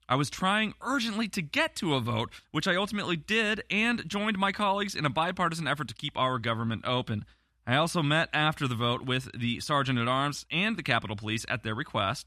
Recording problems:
none

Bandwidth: 14 kHz